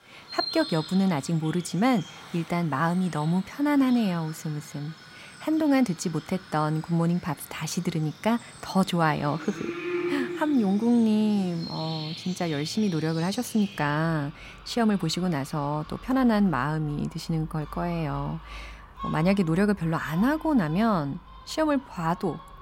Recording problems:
animal sounds; noticeable; throughout; 15 dB below the speech

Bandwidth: 16 kHz